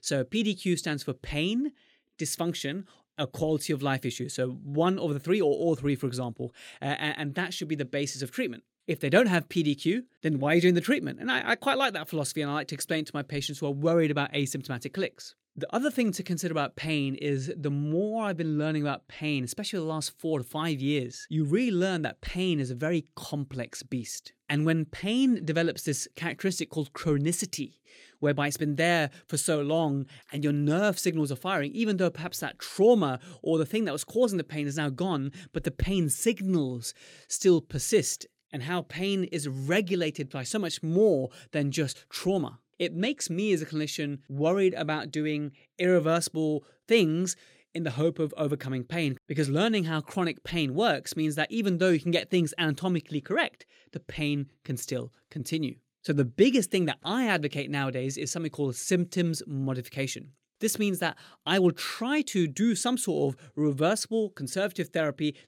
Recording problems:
none

